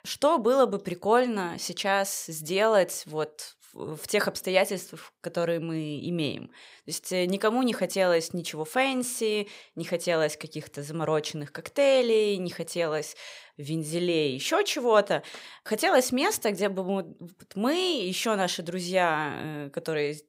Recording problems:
none

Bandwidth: 15.5 kHz